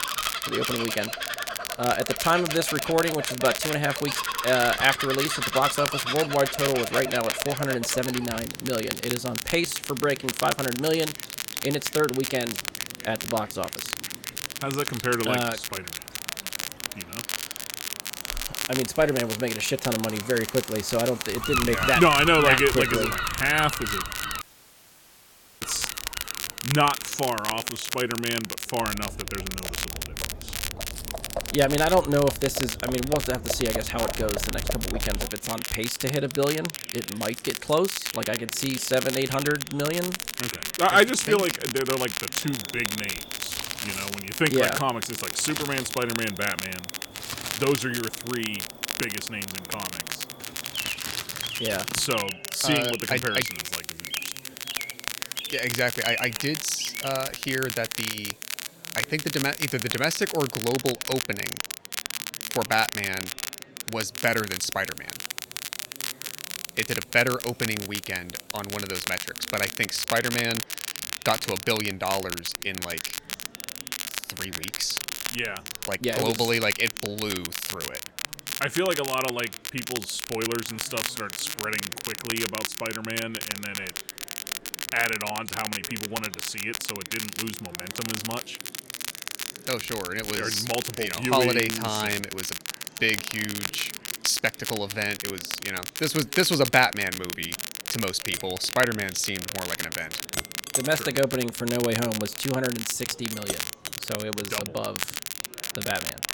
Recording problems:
animal sounds; loud; until 57 s; 6 dB below the speech
crackle, like an old record; loud; 5 dB below the speech
household noises; noticeable; throughout; 15 dB below the speech
murmuring crowd; faint; throughout; 25 dB below the speech
audio cutting out; at 24 s for 1 s

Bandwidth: 17.5 kHz